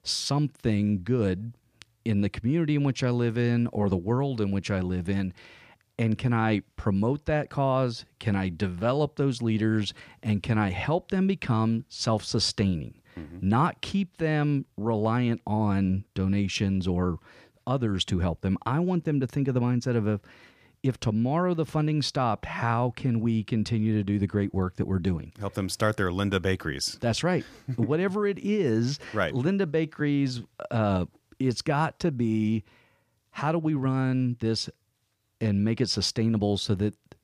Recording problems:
none

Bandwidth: 15 kHz